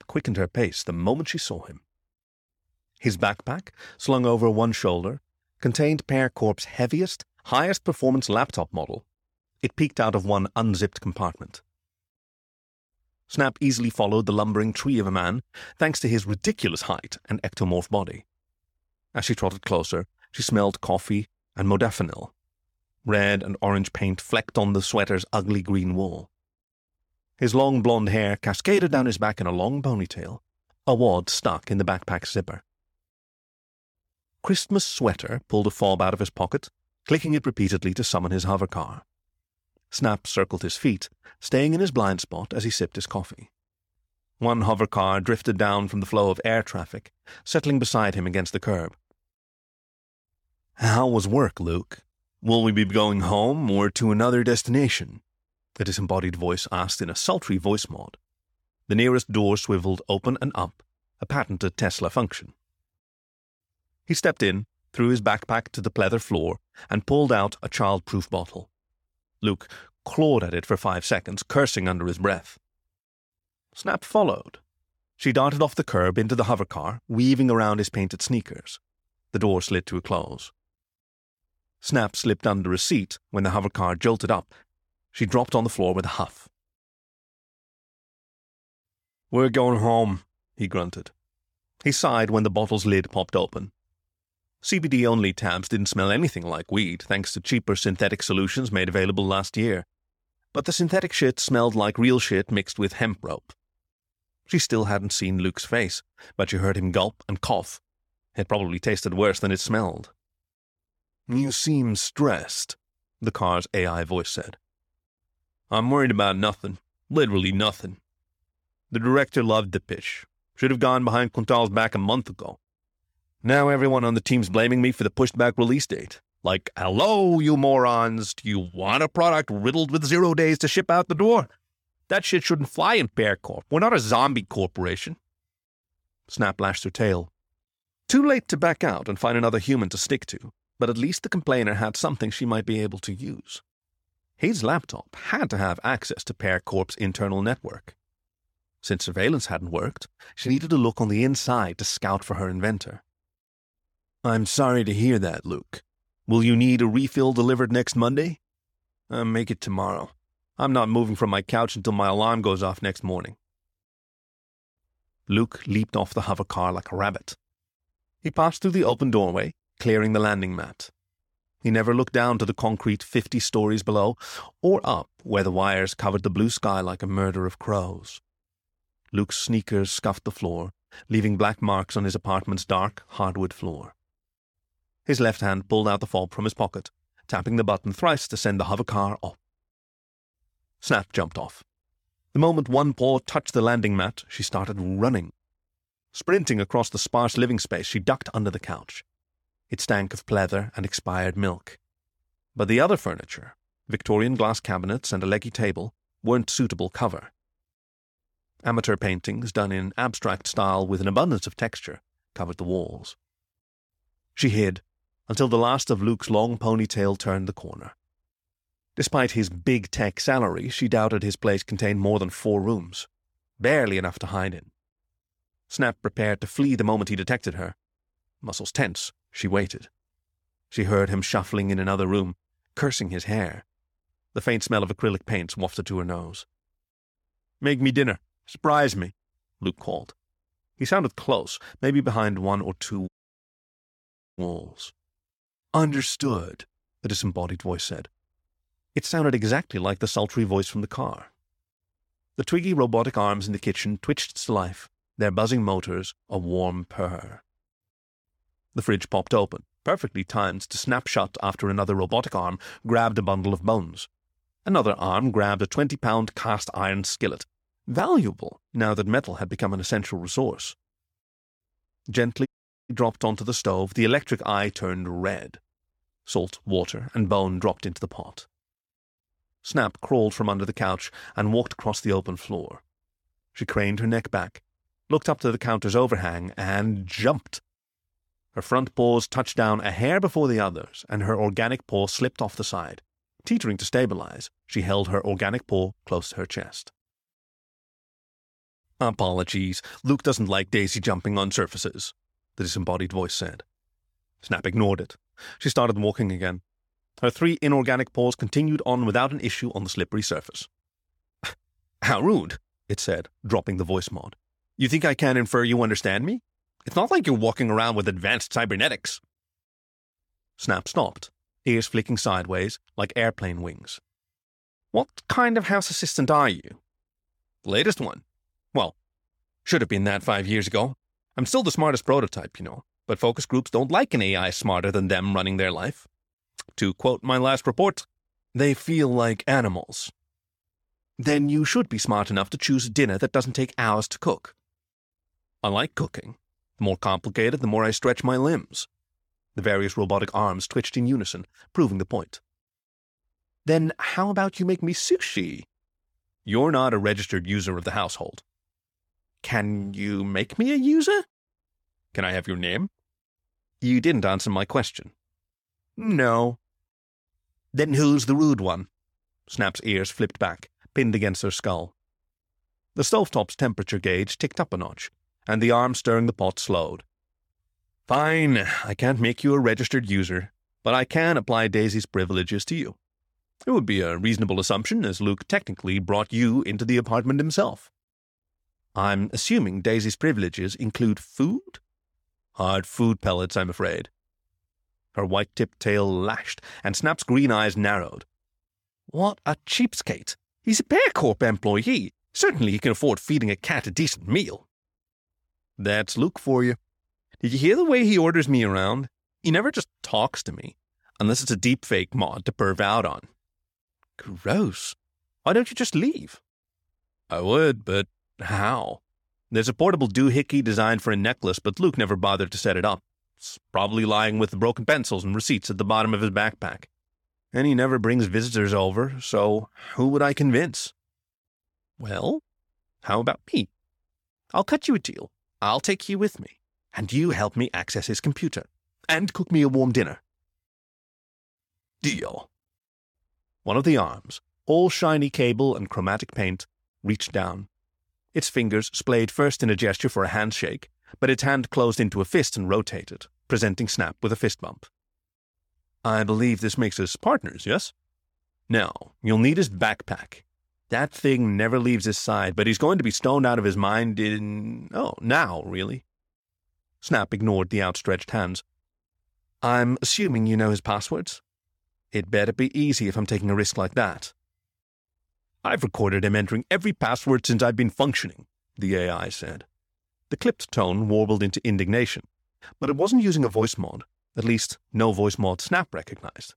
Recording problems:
audio cutting out; at 4:03 for 1.5 s and at 4:32

